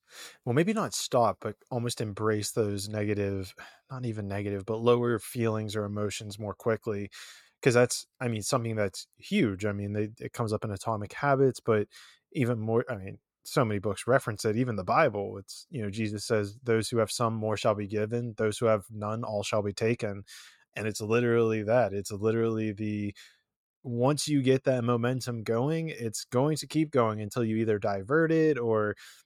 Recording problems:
none

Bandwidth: 17 kHz